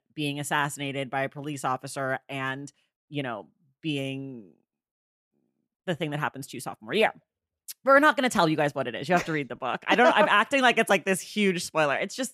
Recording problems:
none

